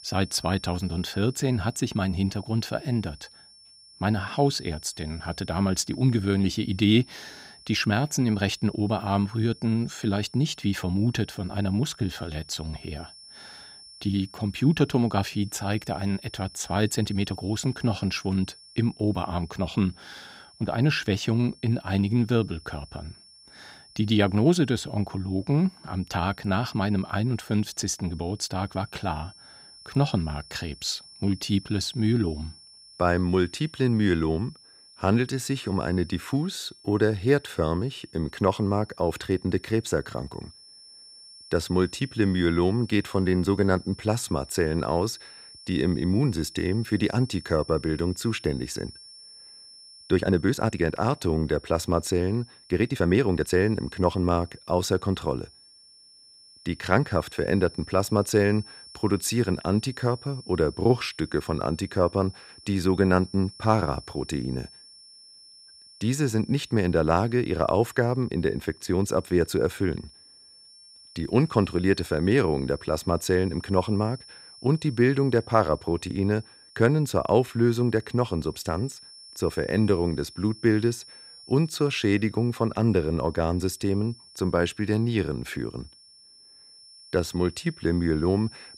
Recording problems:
high-pitched whine; faint; throughout; 5.5 kHz, 20 dB below the speech
uneven, jittery; strongly; from 12 to 54 s

